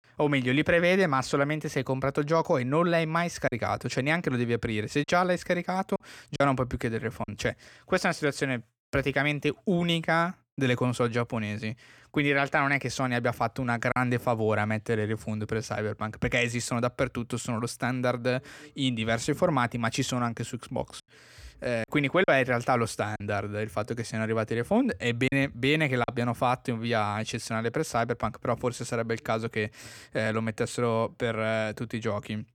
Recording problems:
choppy; occasionally; 2% of the speech affected

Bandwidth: 18.5 kHz